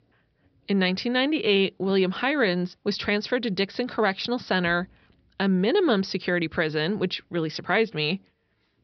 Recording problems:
high frequencies cut off; noticeable; nothing above 5.5 kHz

